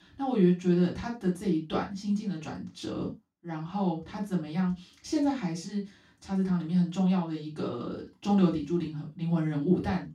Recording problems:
off-mic speech; far
room echo; slight; dies away in 0.2 s

